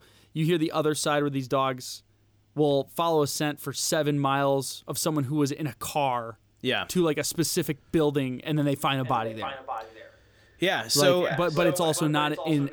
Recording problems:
echo of what is said; strong; from 9 s on; 580 ms later, 9 dB below the speech

